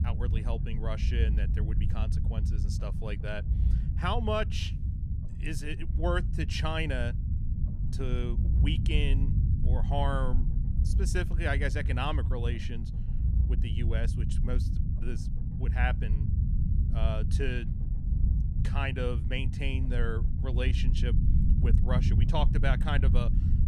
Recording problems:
low rumble; loud; throughout; 9 dB below the speech

